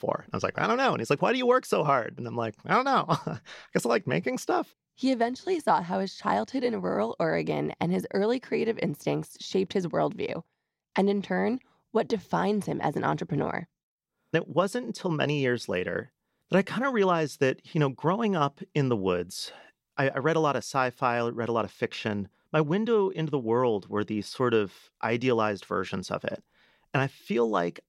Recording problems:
none

